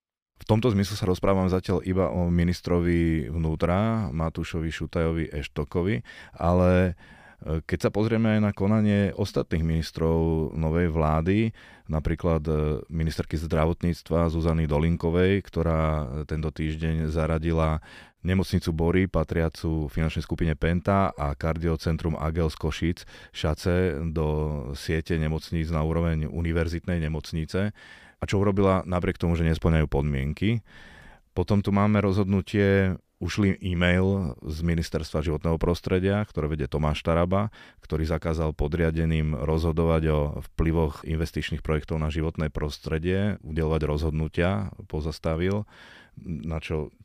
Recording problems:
none

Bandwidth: 15 kHz